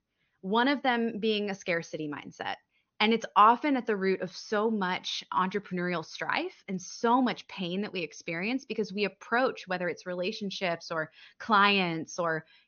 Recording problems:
high frequencies cut off; noticeable; nothing above 6.5 kHz

